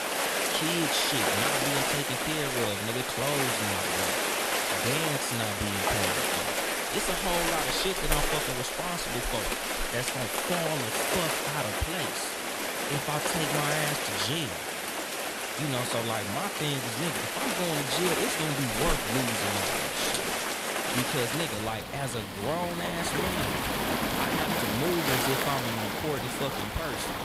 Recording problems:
rain or running water; very loud; throughout; 4 dB above the speech

